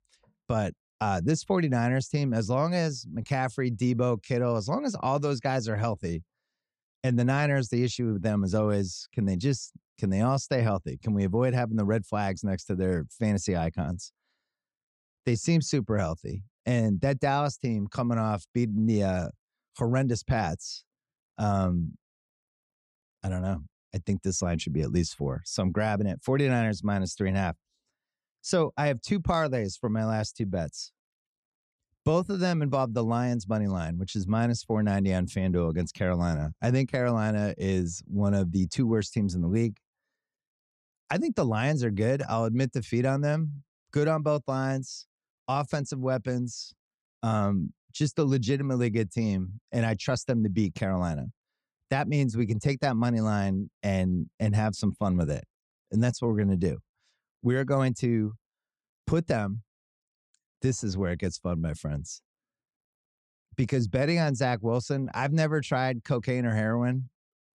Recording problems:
none

